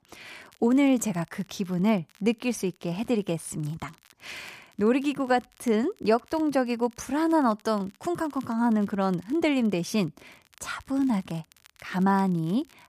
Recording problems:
crackle, like an old record; faint; 30 dB below the speech

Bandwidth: 14.5 kHz